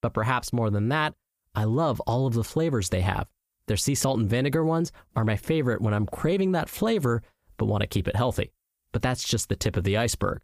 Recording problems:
squashed, flat; heavily

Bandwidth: 15 kHz